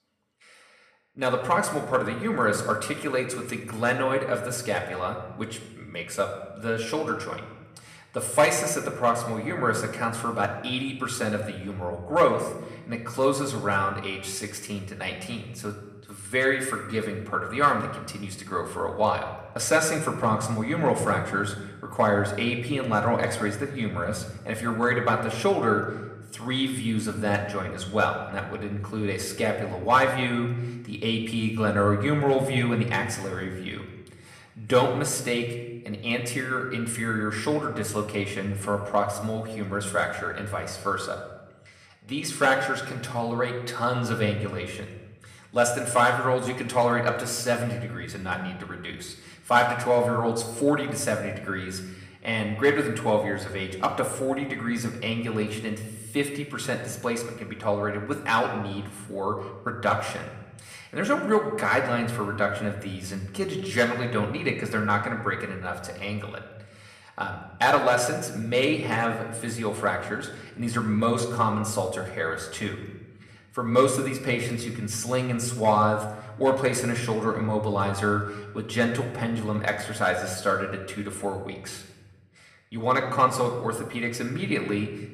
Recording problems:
room echo; slight; dies away in 0.9 s
off-mic speech; somewhat distant

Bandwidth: 15 kHz